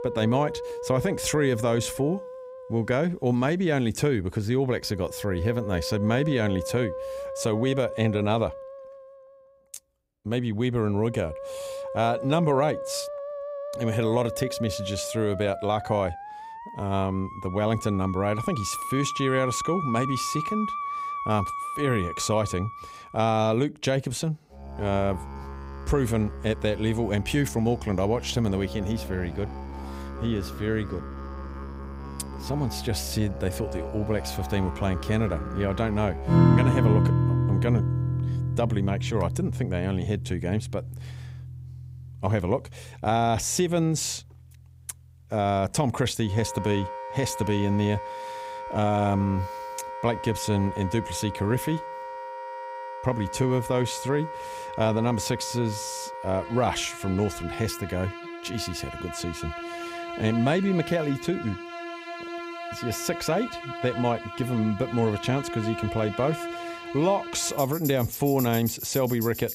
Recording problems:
background music; loud; throughout; 6 dB below the speech

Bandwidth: 15.5 kHz